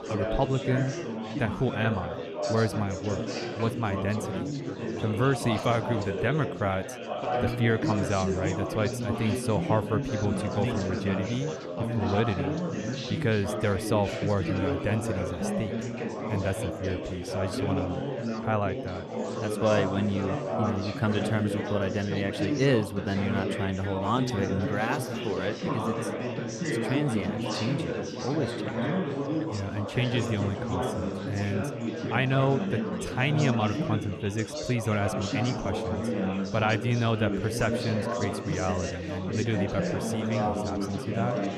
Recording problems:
chatter from many people; loud; throughout; 2 dB below the speech

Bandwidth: 13.5 kHz